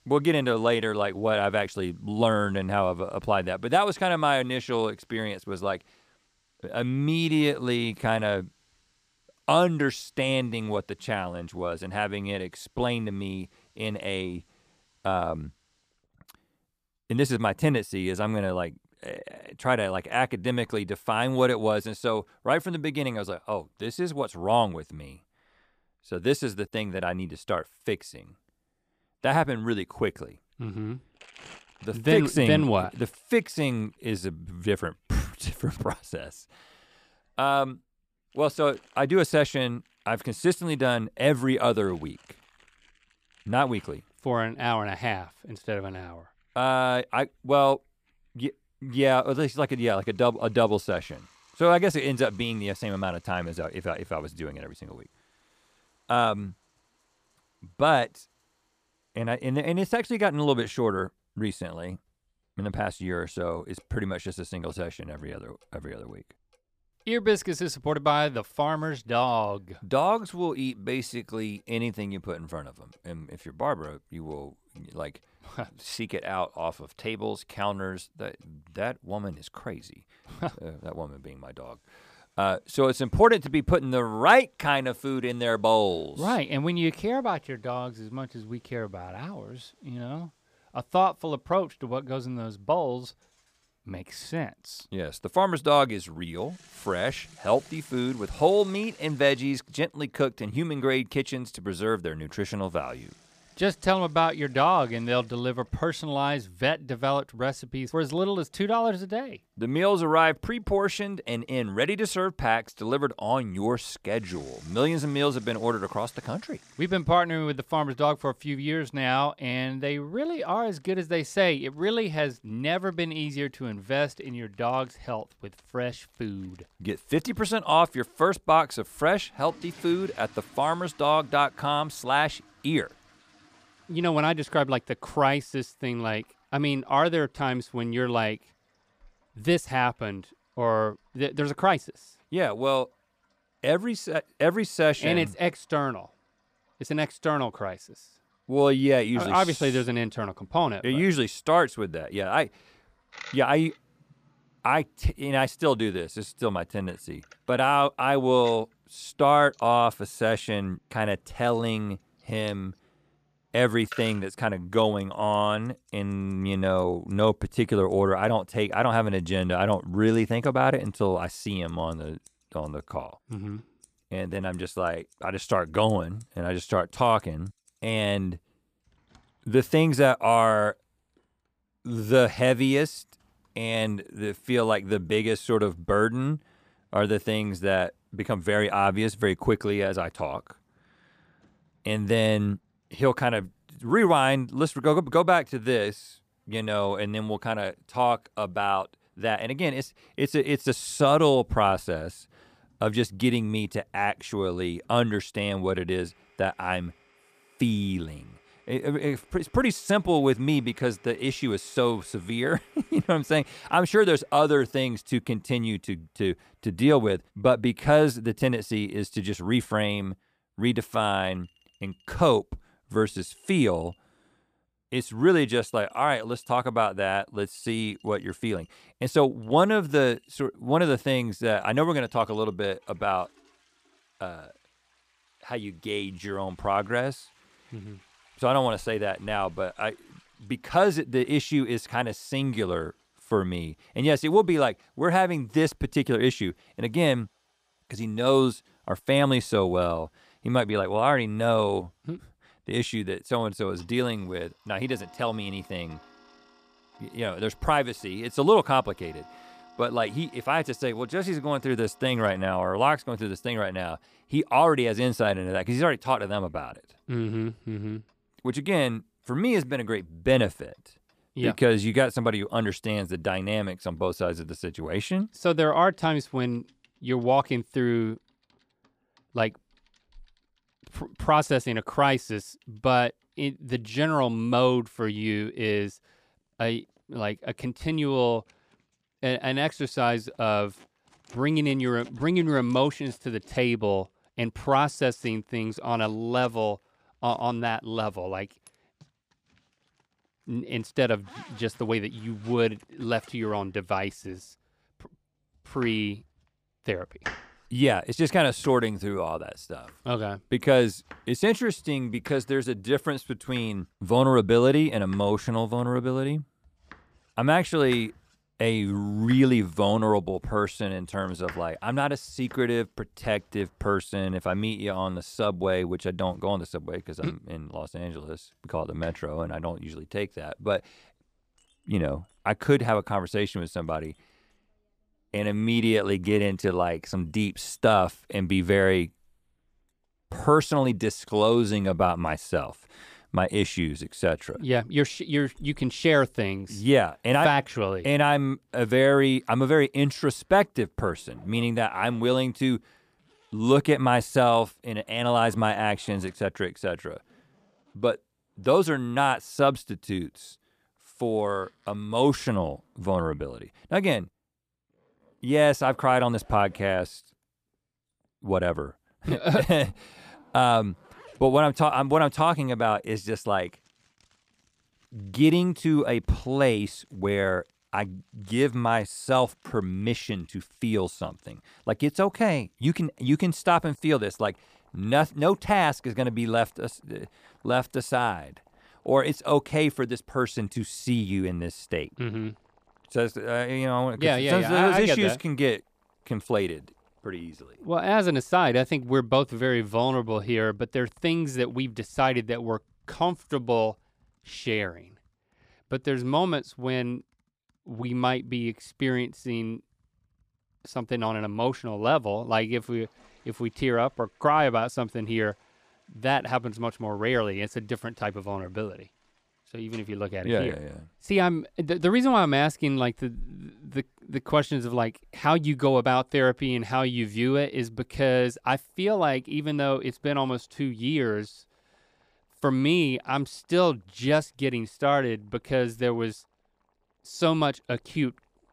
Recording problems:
household noises; faint; throughout; 30 dB below the speech

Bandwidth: 15 kHz